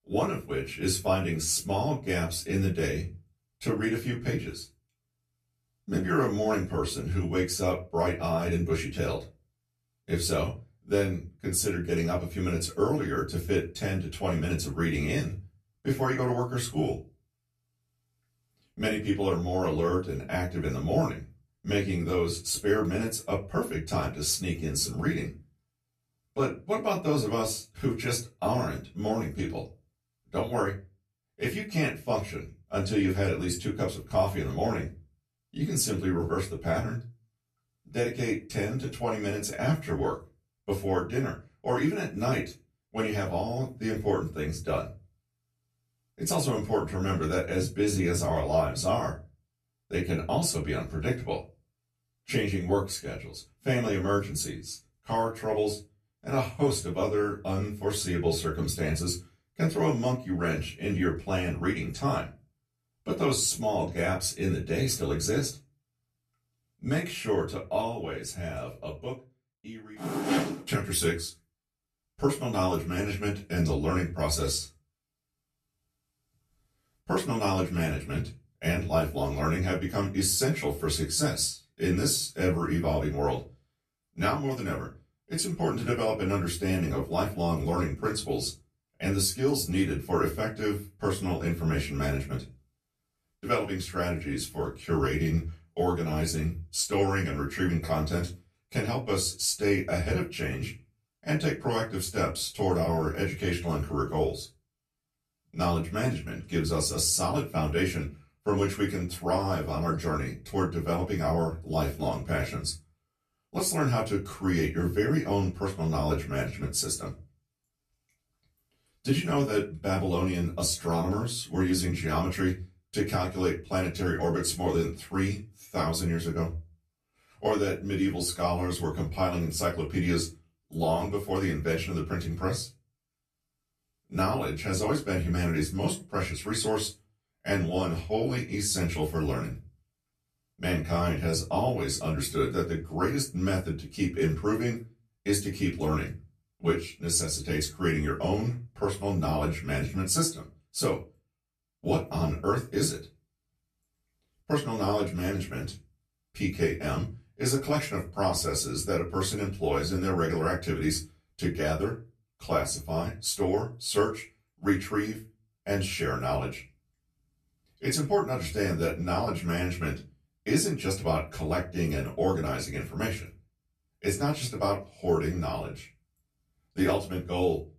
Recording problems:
off-mic speech; far
room echo; very slight; dies away in 0.2 s

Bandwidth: 14 kHz